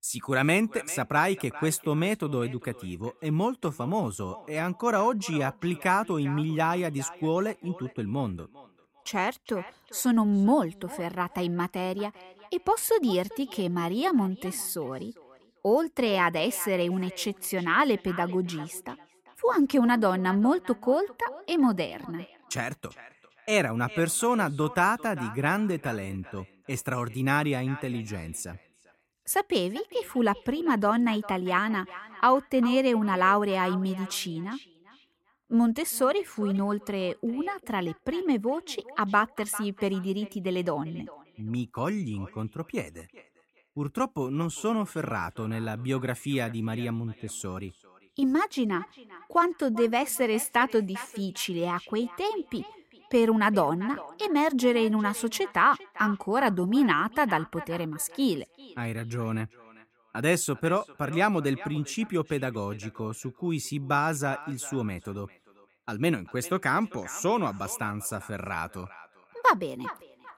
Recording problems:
echo of what is said; faint; throughout; 400 ms later, 20 dB below the speech

